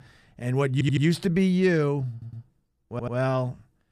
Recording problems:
audio stuttering; at 0.5 s, at 2 s and at 3 s

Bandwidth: 15 kHz